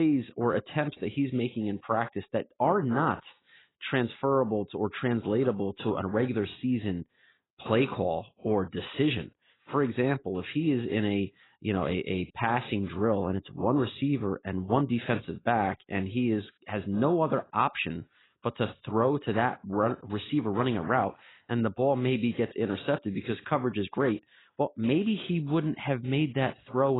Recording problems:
garbled, watery; badly; nothing above 4 kHz
abrupt cut into speech; at the start and the end

